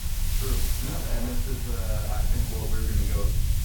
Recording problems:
off-mic speech; far
room echo; slight; dies away in 0.4 s
hiss; very loud; throughout; 3 dB above the speech
rain or running water; loud; throughout; 9 dB below the speech
low rumble; loud; throughout; 7 dB below the speech

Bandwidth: 18 kHz